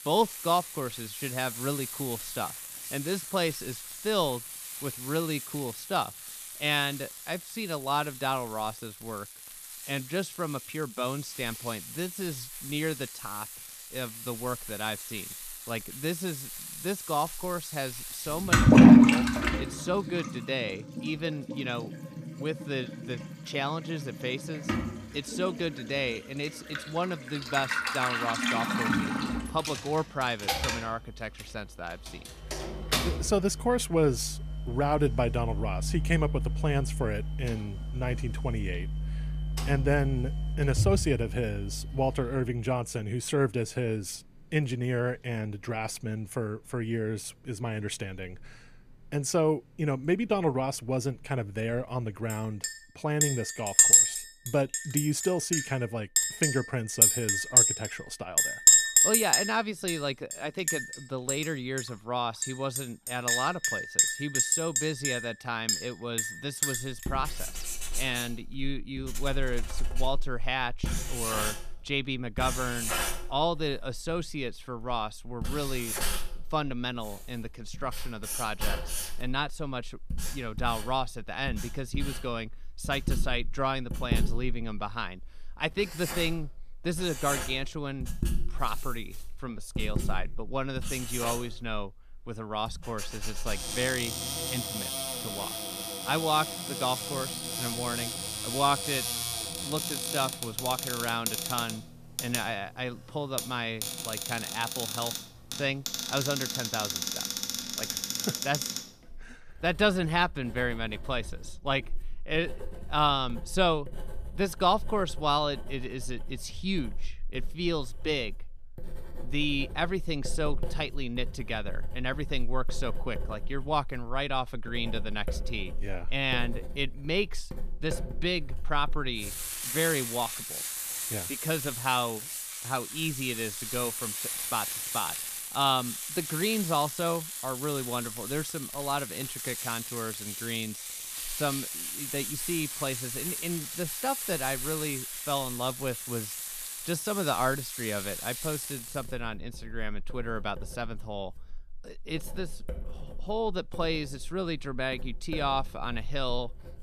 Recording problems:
household noises; very loud; throughout; 2 dB above the speech

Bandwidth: 14.5 kHz